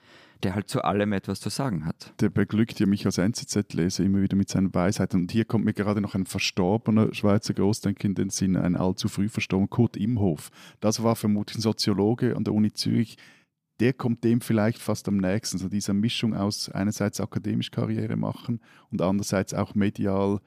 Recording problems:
none

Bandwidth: 15 kHz